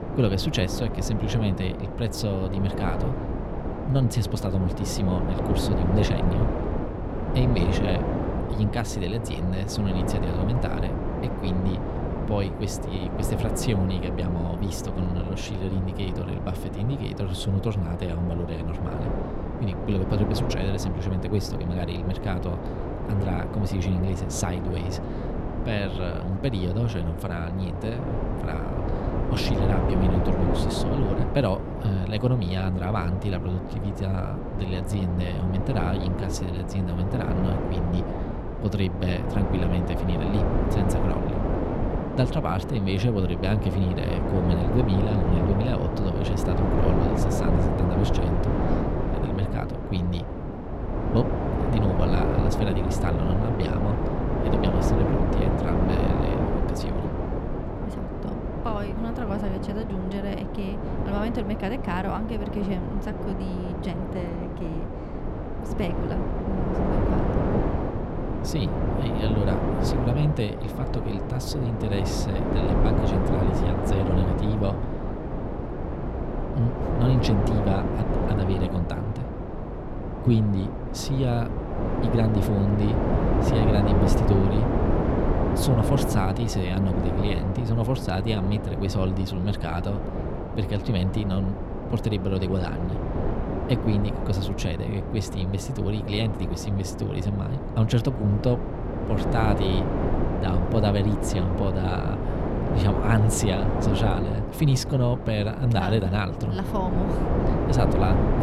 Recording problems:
wind noise on the microphone; heavy; 1 dB above the speech

